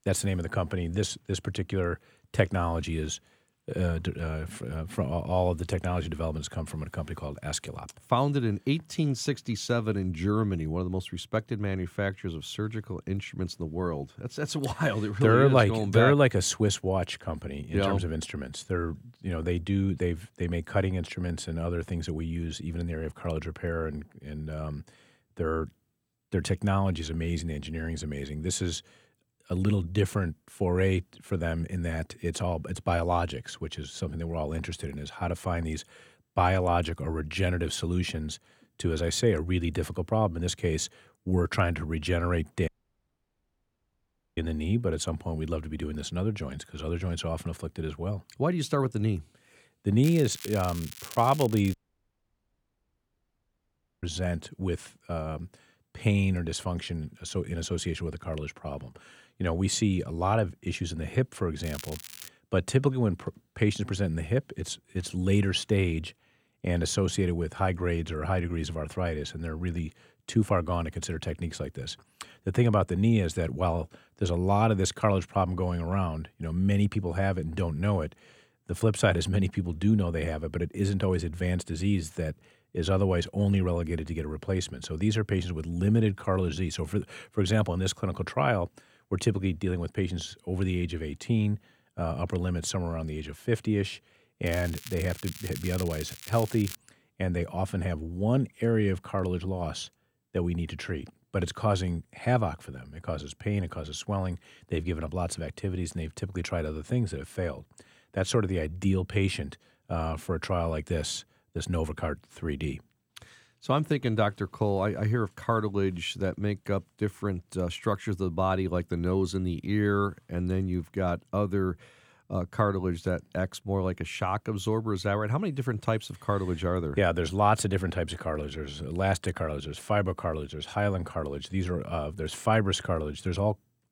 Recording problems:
crackling; noticeable; from 50 to 52 s, at 1:02 and from 1:34 to 1:37; 10 dB below the speech
audio cutting out; at 43 s for 1.5 s and at 52 s for 2.5 s

